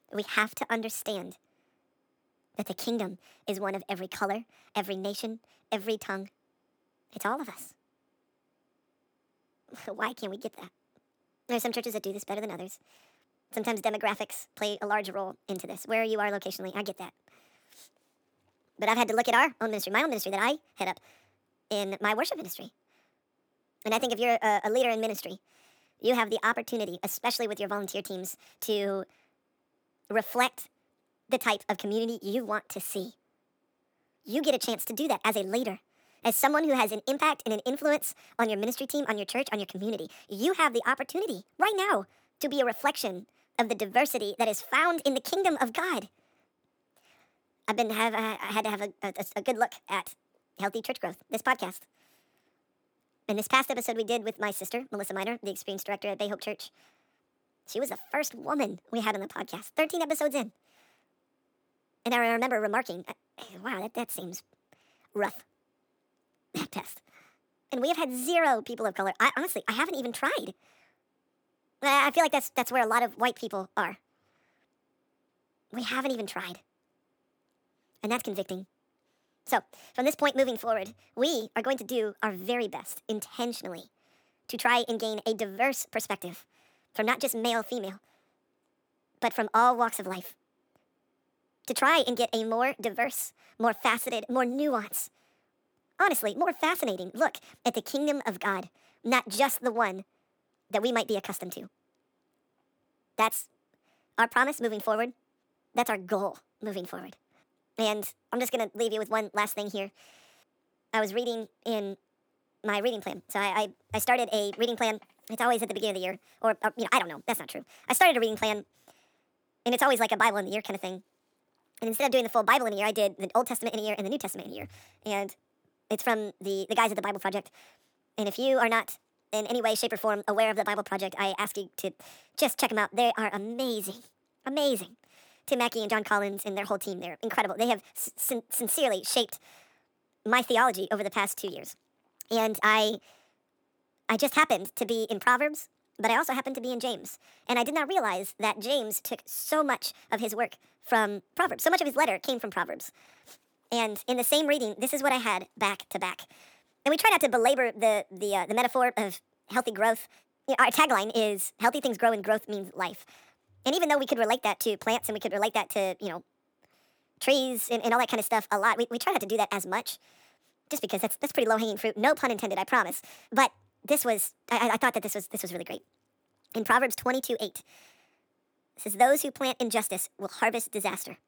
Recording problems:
wrong speed and pitch; too fast and too high; 1.5 times normal speed

